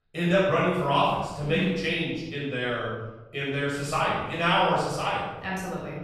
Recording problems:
room echo; strong; dies away in 1.1 s
off-mic speech; far

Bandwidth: 13.5 kHz